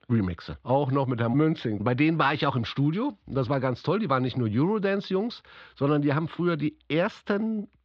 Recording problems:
muffled; slightly; fading above 3.5 kHz

